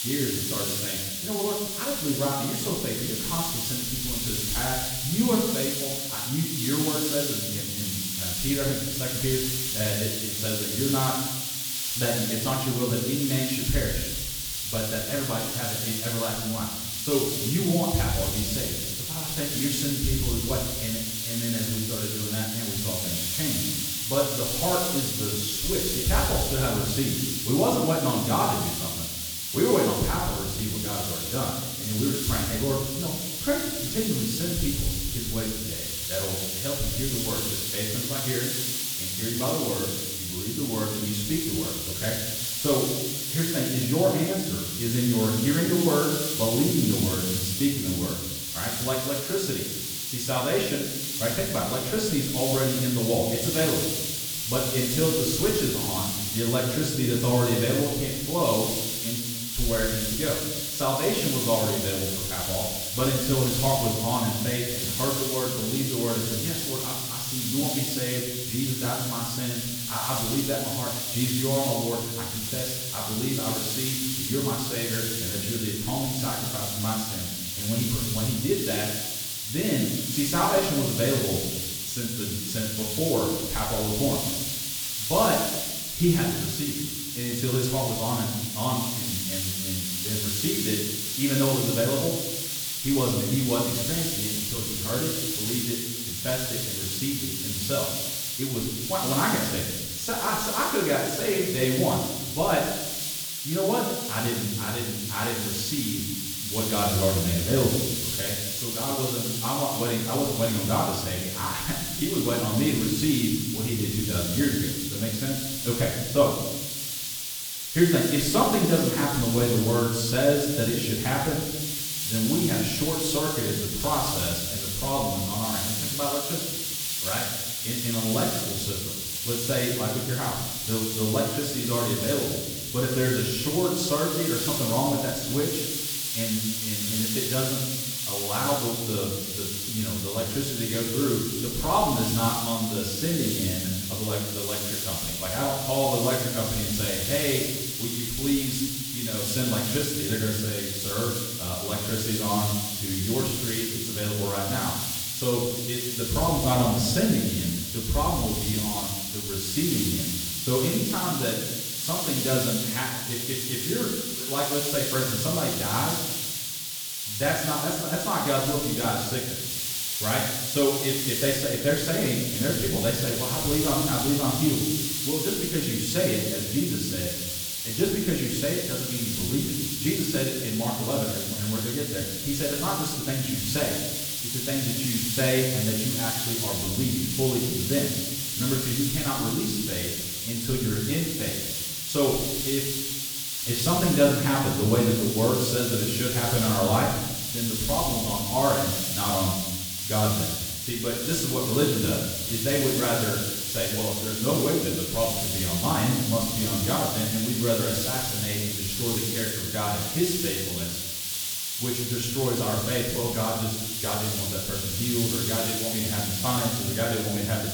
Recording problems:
off-mic speech; far
room echo; noticeable; dies away in 1.1 s
hiss; loud; throughout; as loud as the speech

